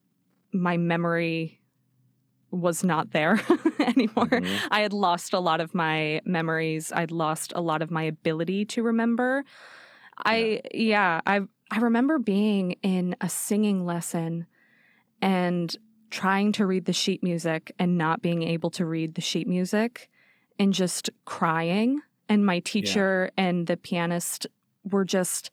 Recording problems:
none

